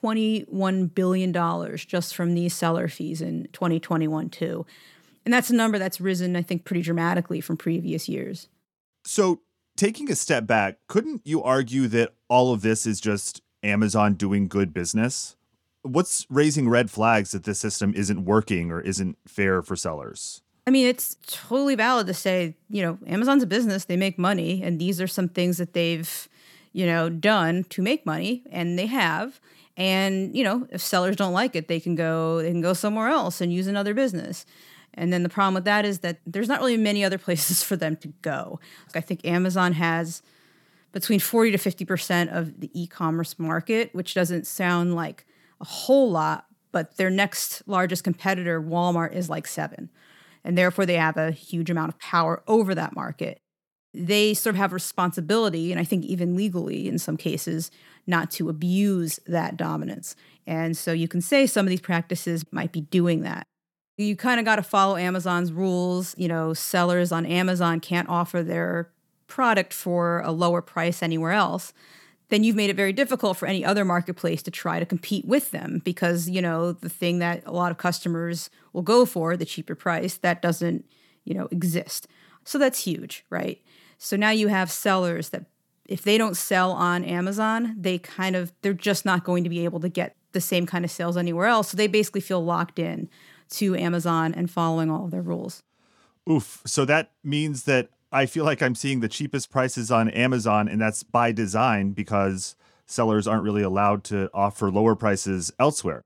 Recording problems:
none

